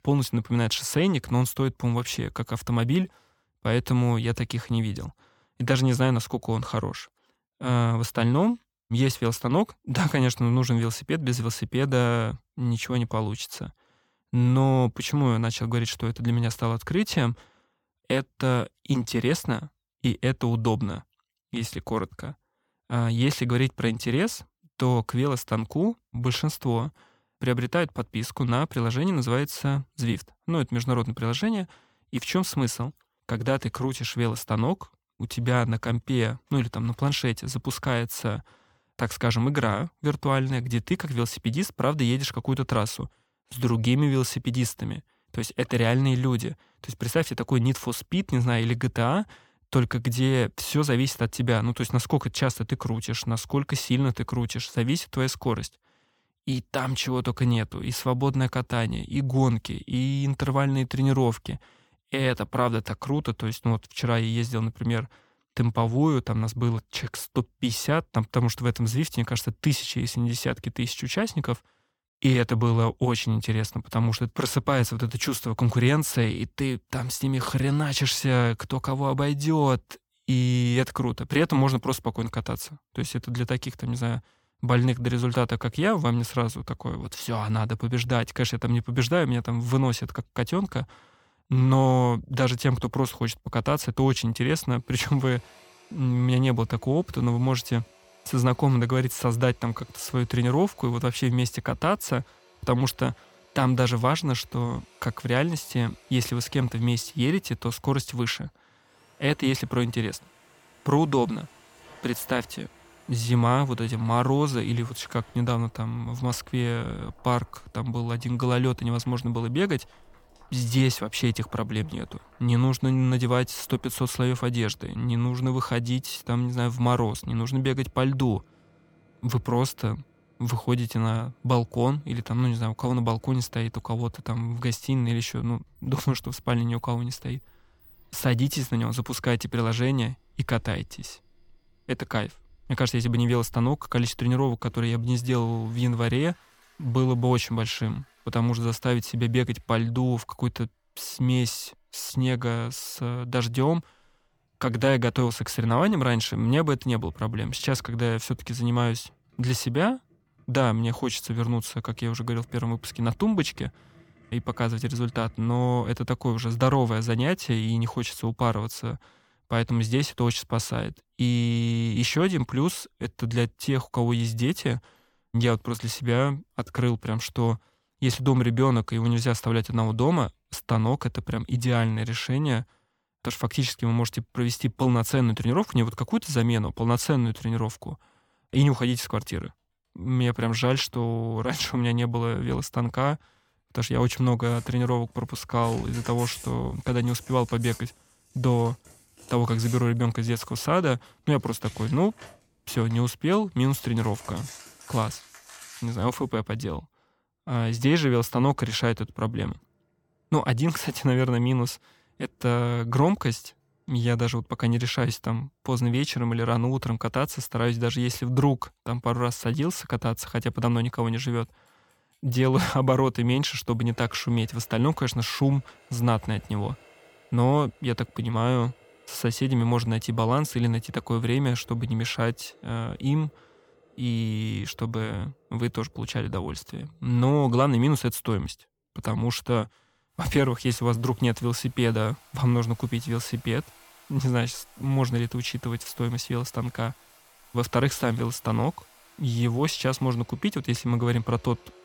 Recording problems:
household noises; faint; from 1:35 on; 25 dB below the speech

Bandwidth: 18.5 kHz